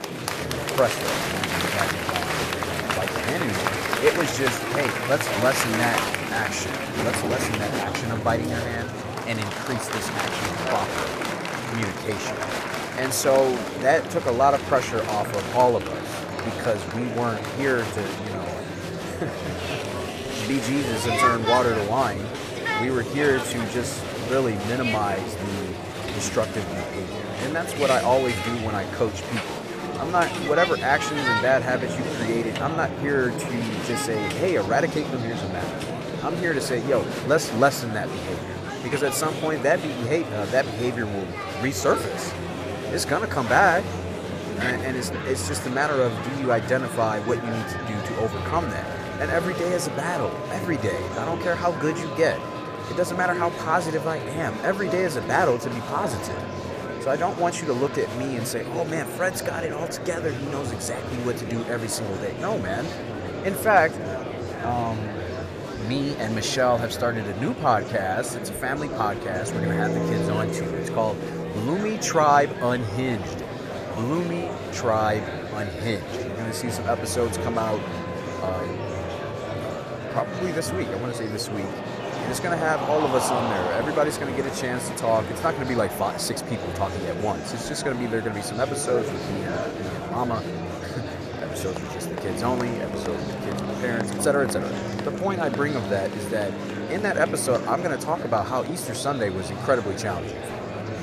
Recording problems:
murmuring crowd; loud; throughout; 4 dB below the speech
background music; noticeable; from 31 s on; 10 dB below the speech

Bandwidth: 14.5 kHz